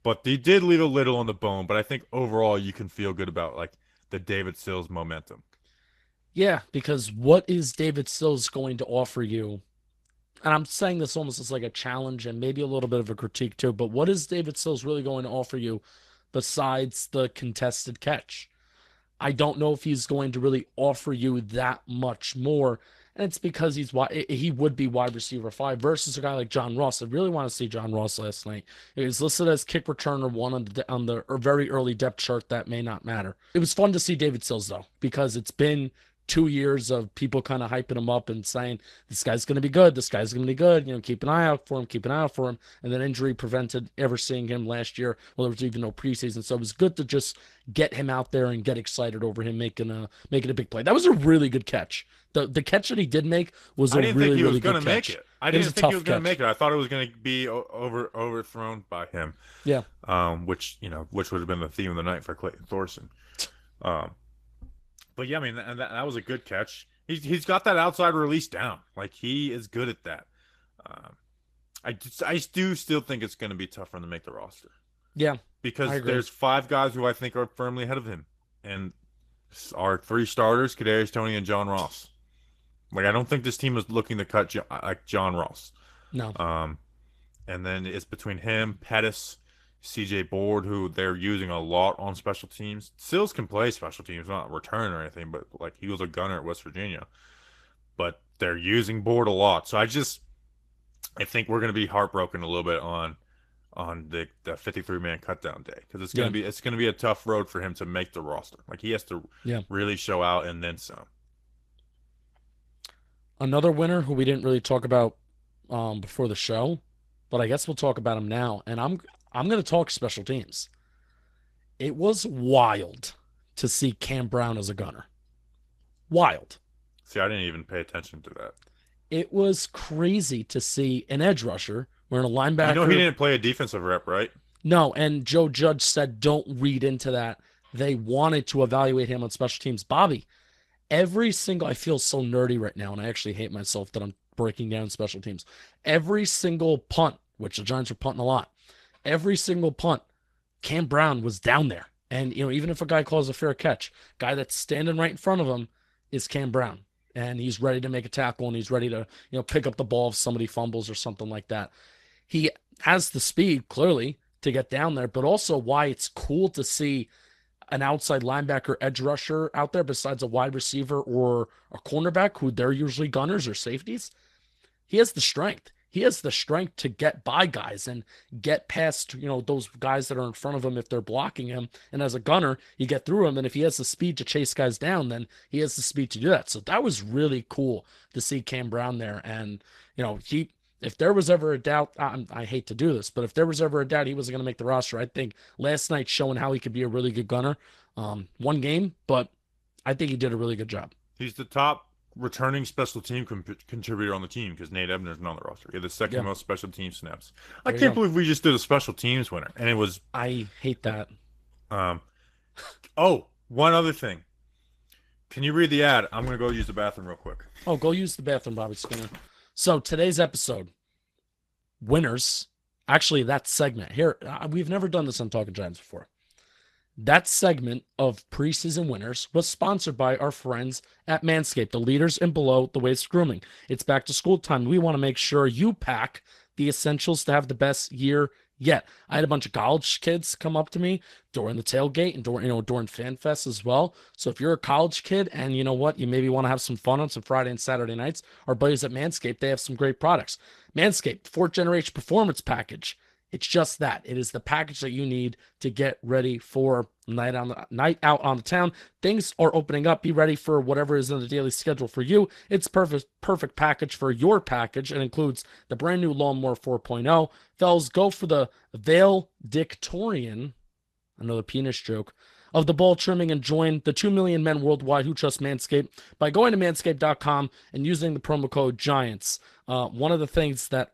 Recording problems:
garbled, watery; slightly; nothing above 14 kHz

